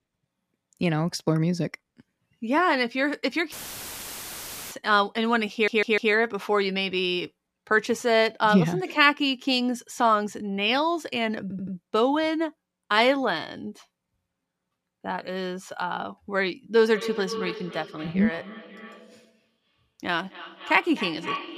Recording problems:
echo of what is said; noticeable; from 17 s on; 260 ms later, 10 dB below the speech
audio cutting out; filled with static; at 3.5 s for 1 s
audio stuttering; at 5.5 s and at 11 s

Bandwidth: 14.5 kHz